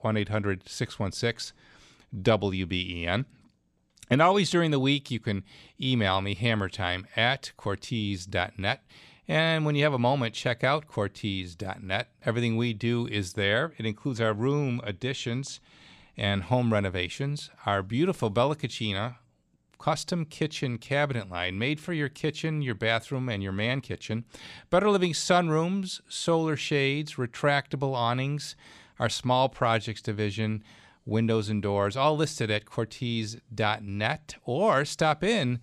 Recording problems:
none

